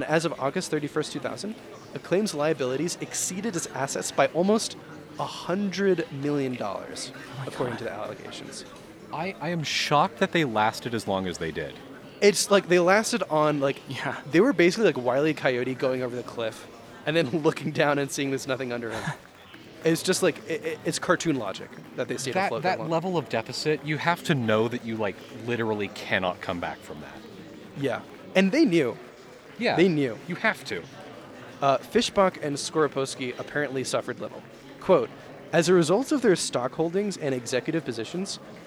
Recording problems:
chatter from many people; noticeable; throughout; 20 dB below the speech
abrupt cut into speech; at the start

